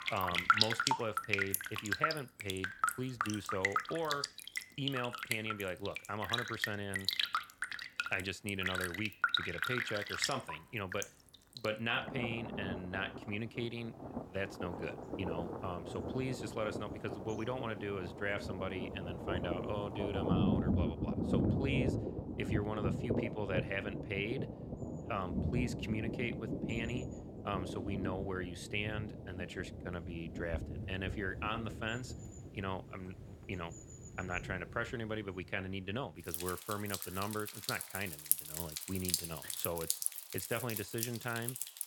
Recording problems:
rain or running water; very loud; throughout; 2 dB above the speech

